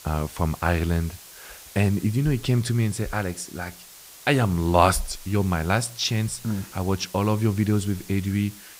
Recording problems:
hiss; noticeable; throughout; 20 dB below the speech

